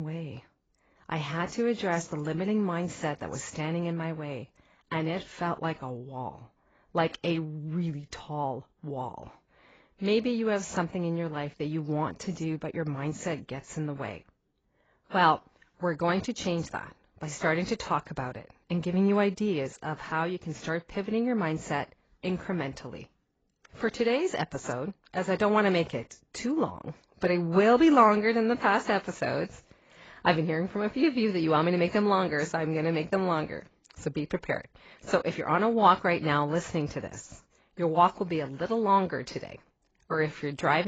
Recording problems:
garbled, watery; badly; nothing above 7.5 kHz
abrupt cut into speech; at the start and the end

